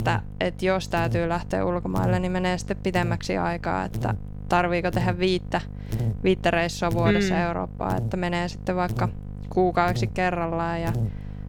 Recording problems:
electrical hum; noticeable; throughout; 50 Hz, 15 dB below the speech

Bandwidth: 17.5 kHz